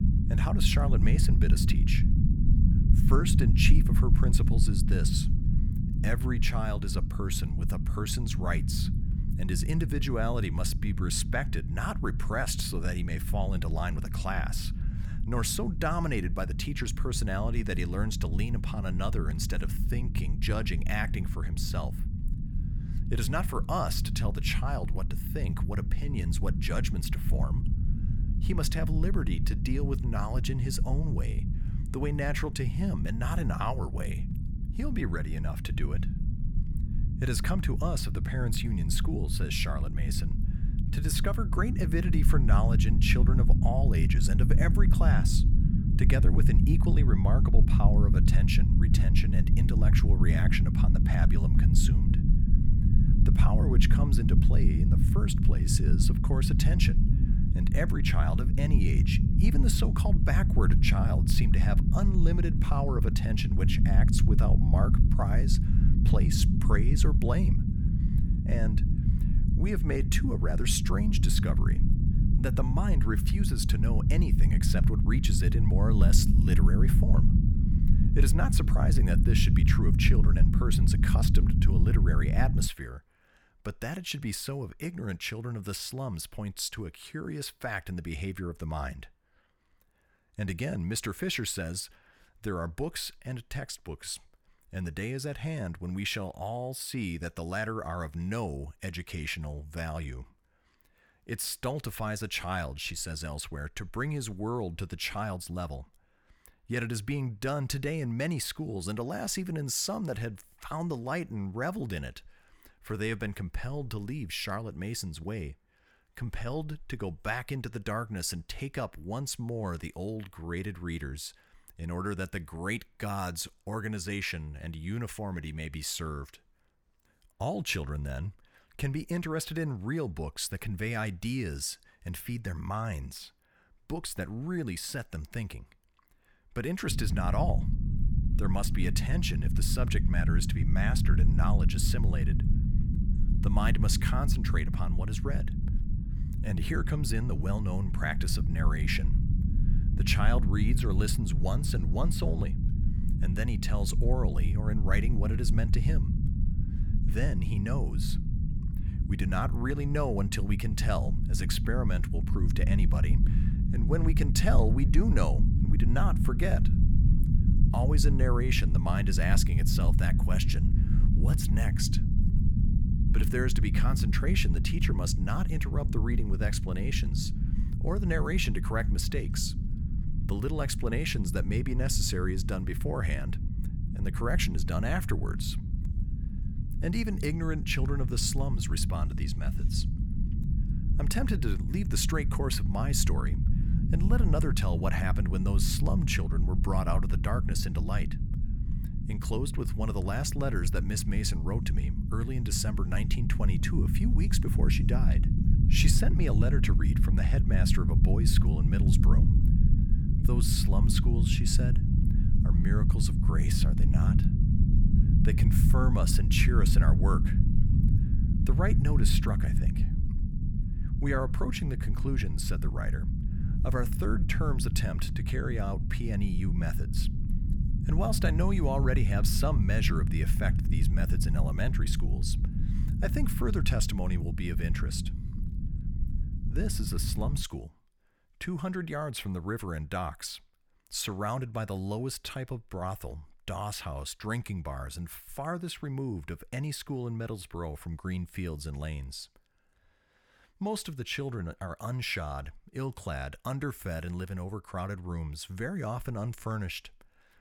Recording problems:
low rumble; loud; until 1:23 and from 2:17 to 3:57; 6 dB below the speech

